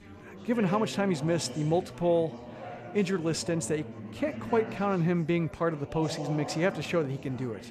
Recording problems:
chatter from many people; noticeable; throughout; 10 dB below the speech

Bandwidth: 14.5 kHz